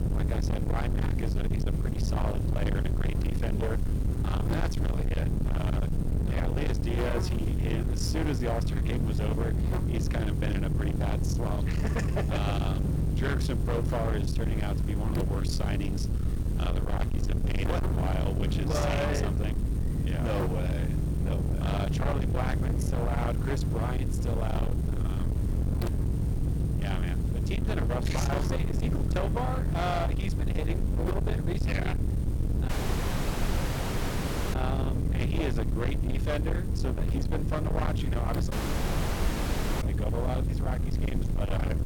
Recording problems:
distortion; heavy; 49% of the sound clipped
electrical hum; loud; throughout; 50 Hz, 8 dB below the speech
low rumble; loud; throughout; 5 dB below the speech
hiss; faint; throughout; 25 dB below the speech
audio cutting out; at 33 s for 2 s and at 39 s for 1.5 s

